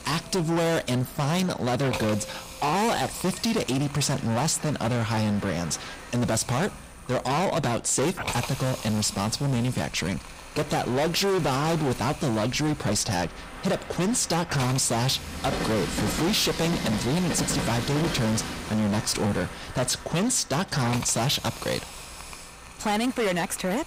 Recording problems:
distortion; heavy; 23% of the sound clipped
train or aircraft noise; loud; throughout; 10 dB below the speech
hiss; noticeable; throughout; 15 dB below the speech

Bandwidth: 15.5 kHz